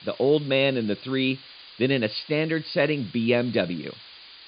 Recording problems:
high frequencies cut off; severe; nothing above 5 kHz
hiss; noticeable; throughout; 20 dB below the speech

